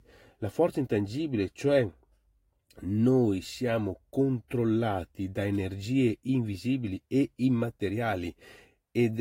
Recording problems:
garbled, watery; slightly; nothing above 16 kHz
abrupt cut into speech; at the end

